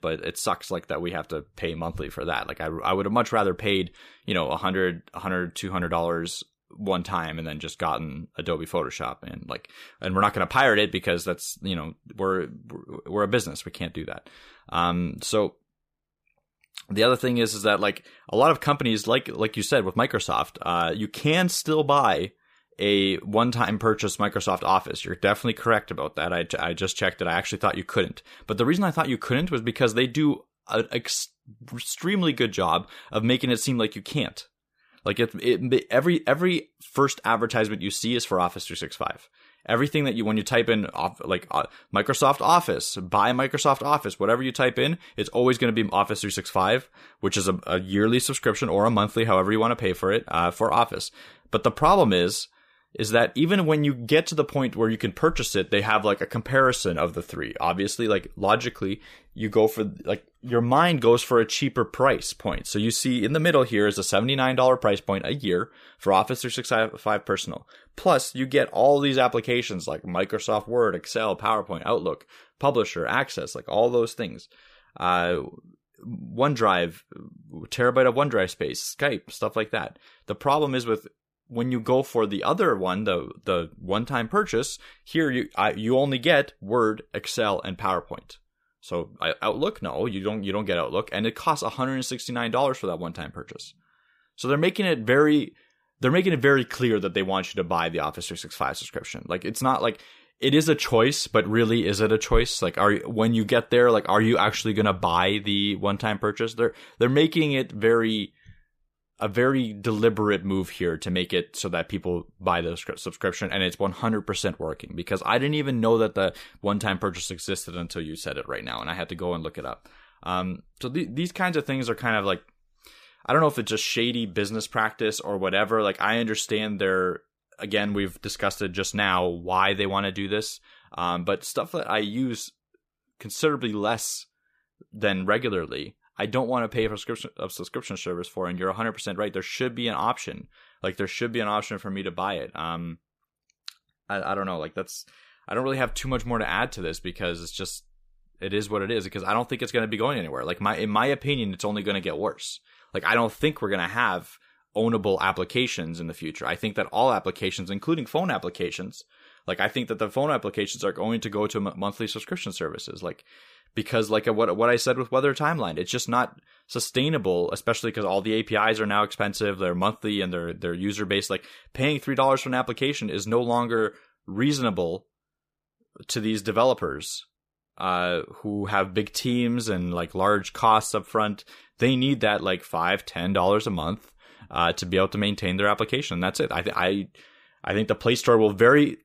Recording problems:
none

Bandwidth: 15 kHz